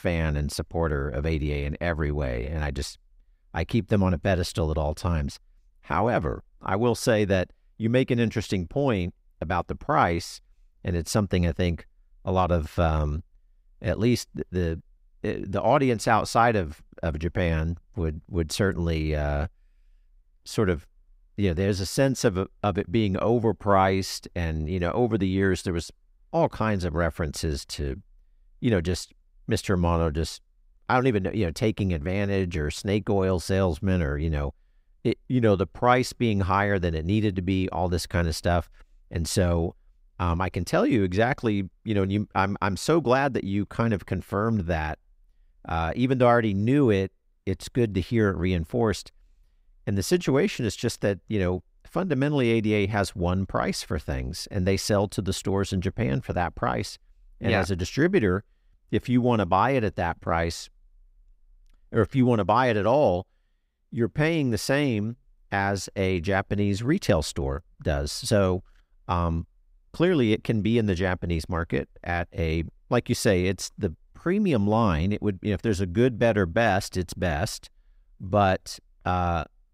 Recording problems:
none

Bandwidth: 15.5 kHz